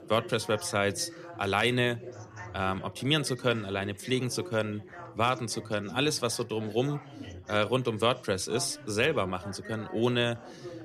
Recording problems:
background chatter; noticeable; throughout; 4 voices, 15 dB below the speech

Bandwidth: 14.5 kHz